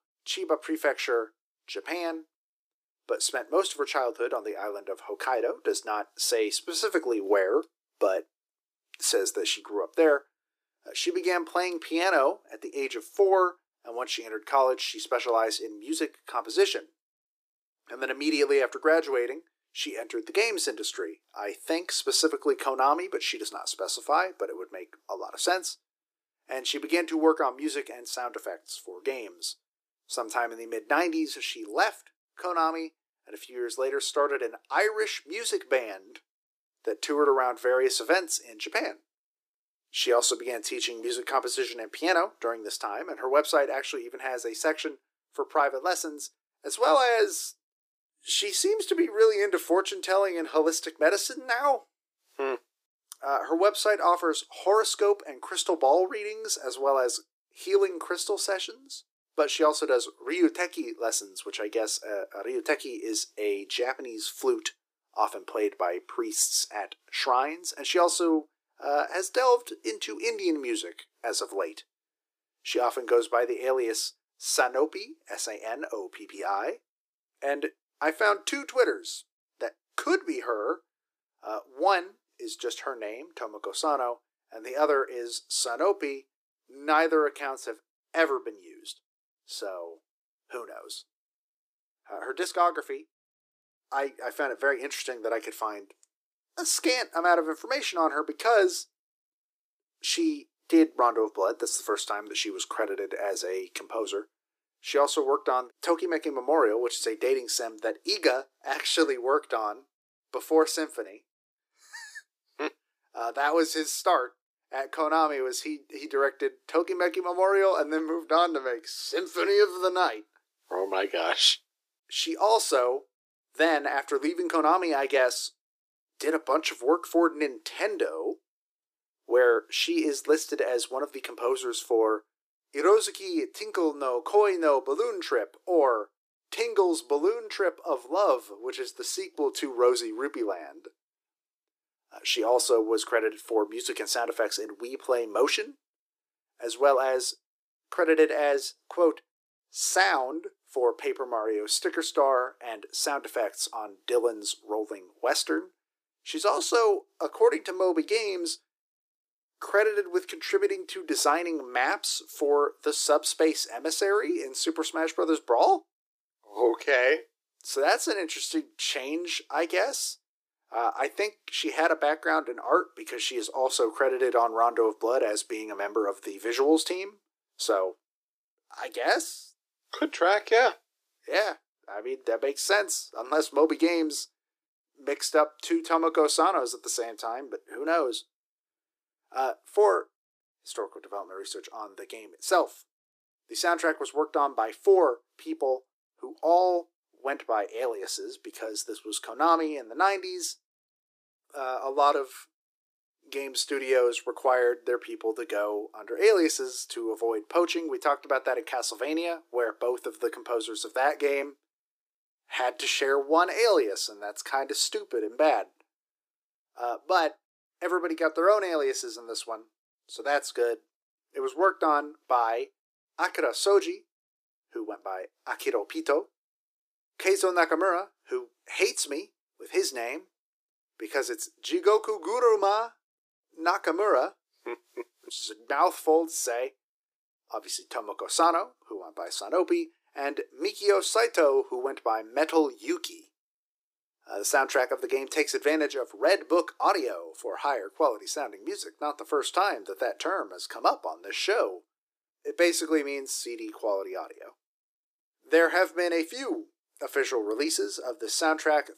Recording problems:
thin; very; fading below 300 Hz

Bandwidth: 15 kHz